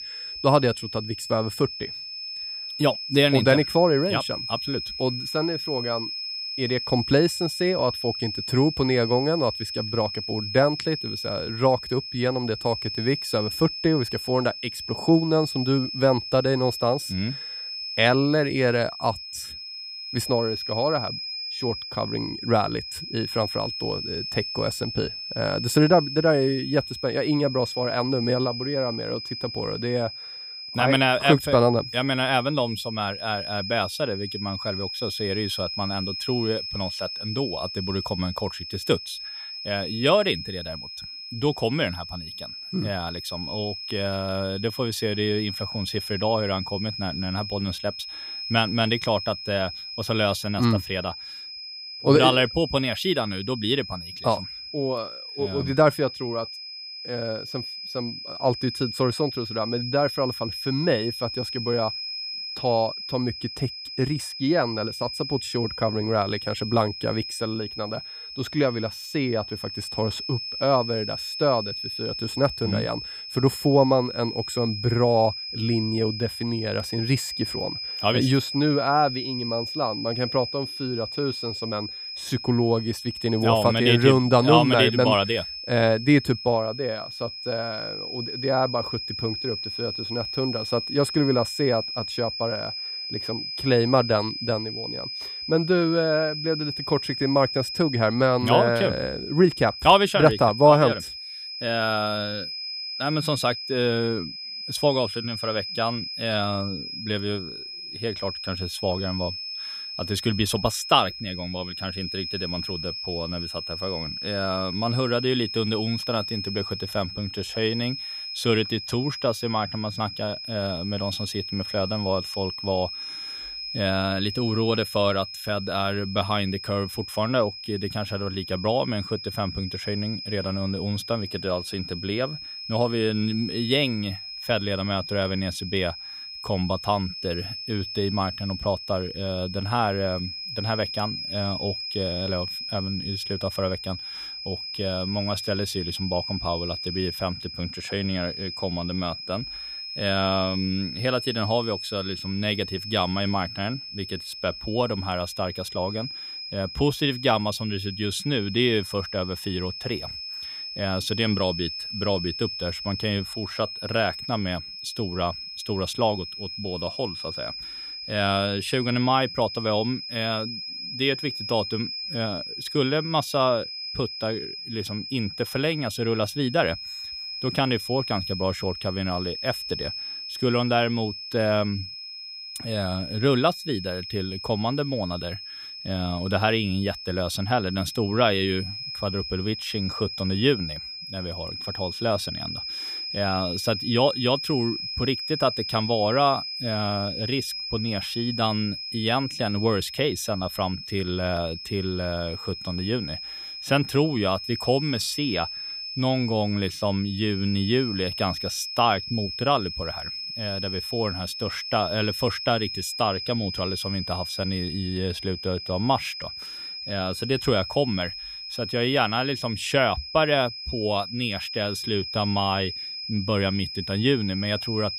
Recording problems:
high-pitched whine; loud; throughout; 5 kHz, 6 dB below the speech

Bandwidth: 15.5 kHz